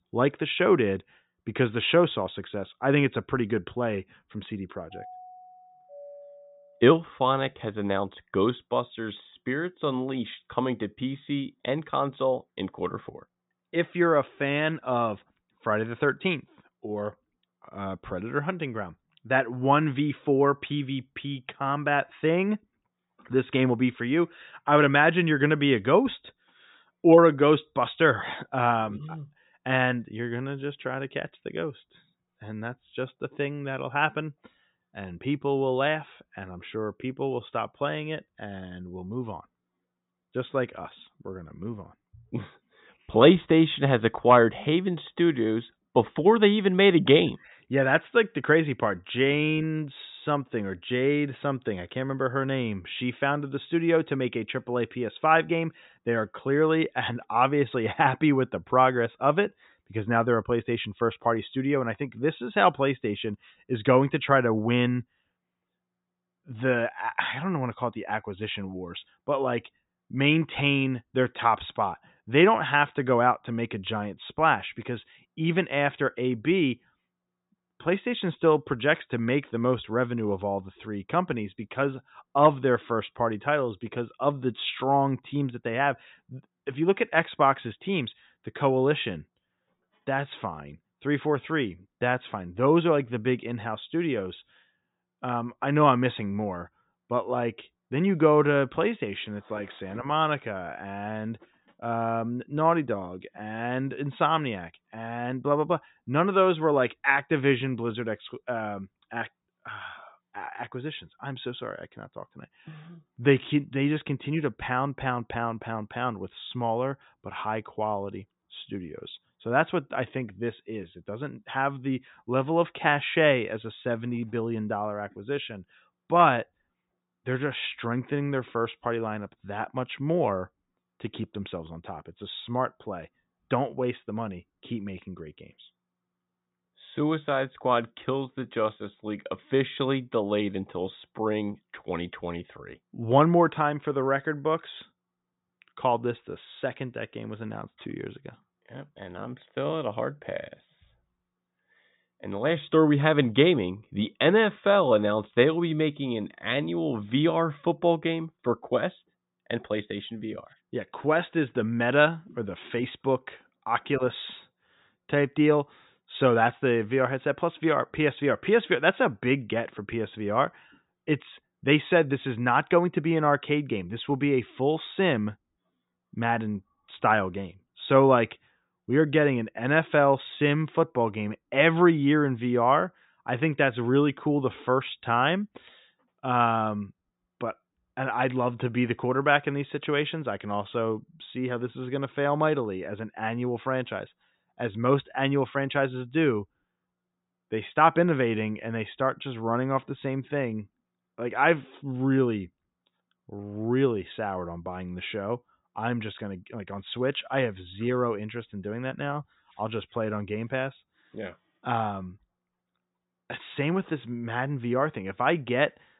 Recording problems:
high frequencies cut off; severe; nothing above 4 kHz
doorbell; faint; from 5 to 7 s; peak 20 dB below the speech

